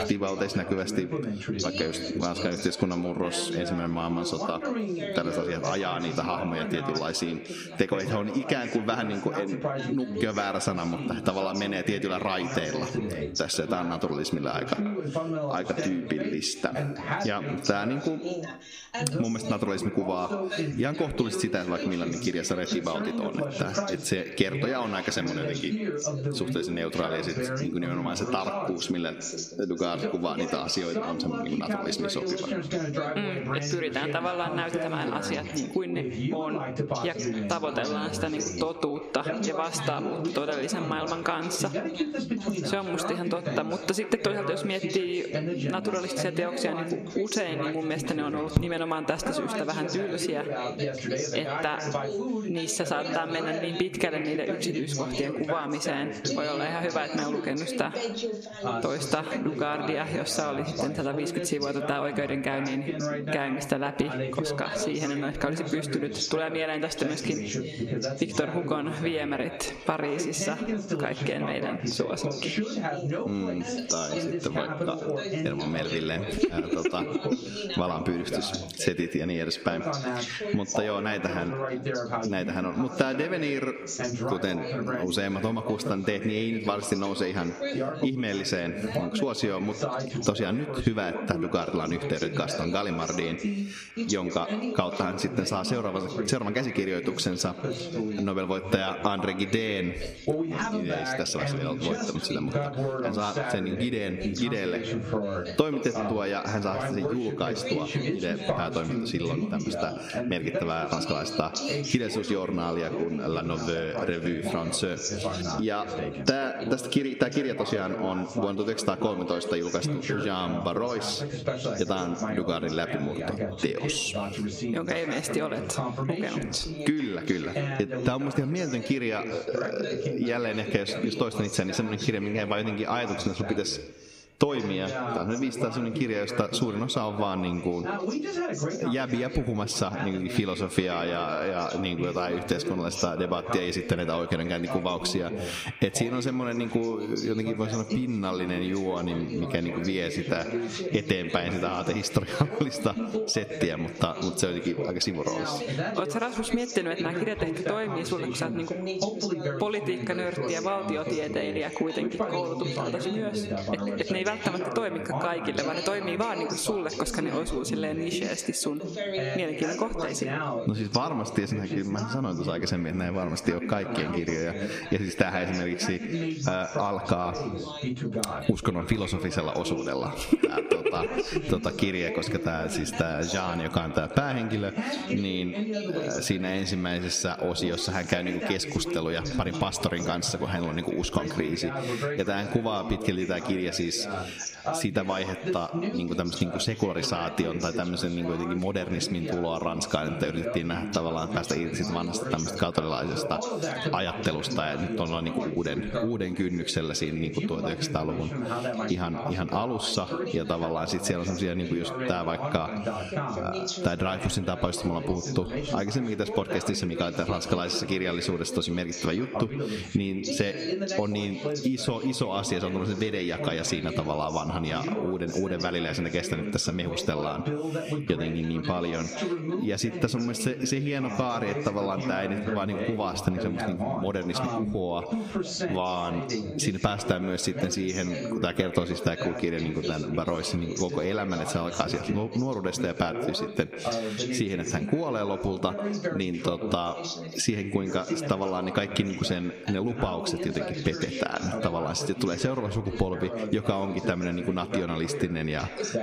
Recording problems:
echo of what is said; strong; throughout; 140 ms later, 10 dB below the speech
squashed, flat; somewhat, background pumping
background chatter; loud; throughout; 2 voices, 4 dB below the speech

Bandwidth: 15 kHz